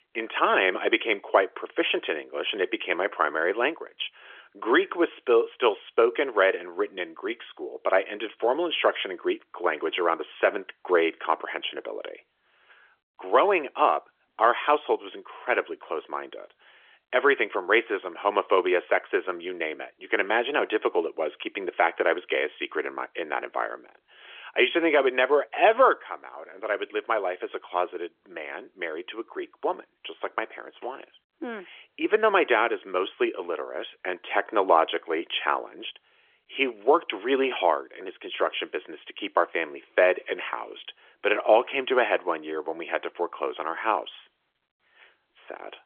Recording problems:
phone-call audio; nothing above 3.5 kHz

